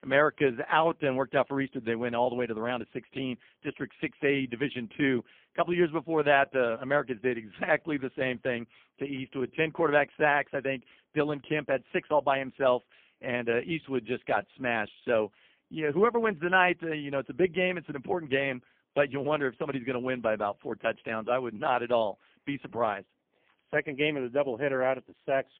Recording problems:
phone-call audio; poor line; nothing above 3 kHz

